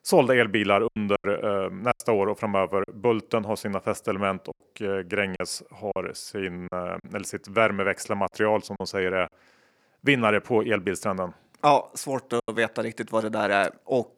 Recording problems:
choppy; very; 5% of the speech affected

